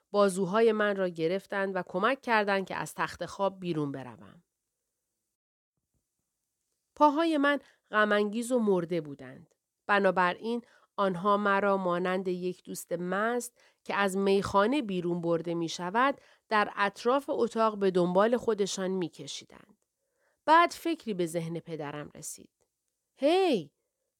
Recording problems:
none

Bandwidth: 18.5 kHz